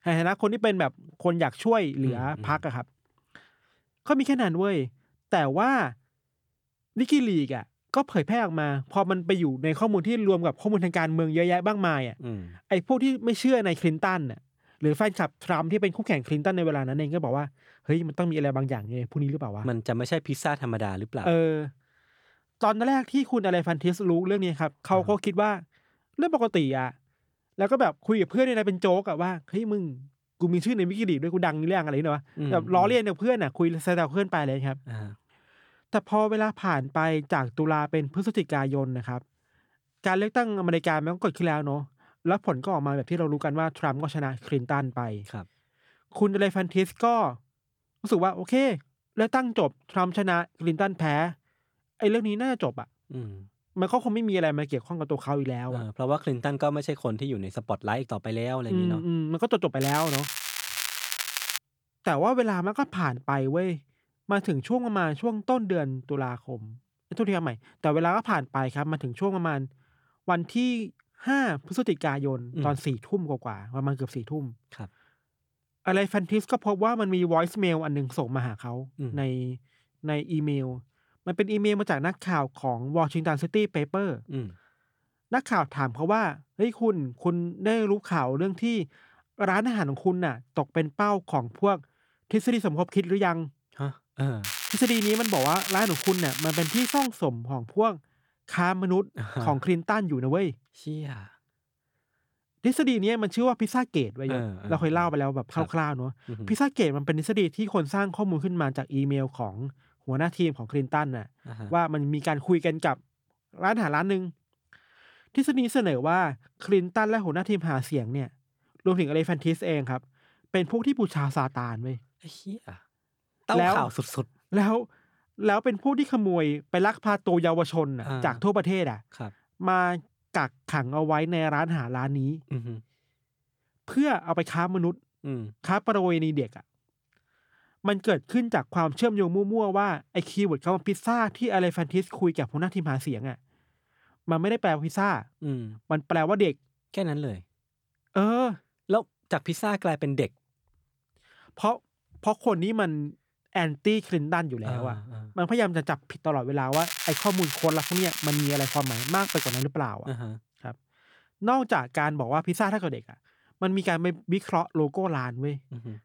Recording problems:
crackling; loud; from 1:00 to 1:02, from 1:34 to 1:37 and from 2:37 to 2:40; 3 dB below the speech

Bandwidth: 18.5 kHz